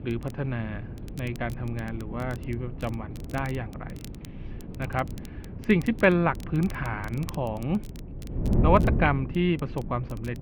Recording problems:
muffled; very; fading above 2.5 kHz
wind noise on the microphone; occasional gusts; 15 dB below the speech
rain or running water; faint; throughout; 25 dB below the speech
crackle, like an old record; faint; 25 dB below the speech

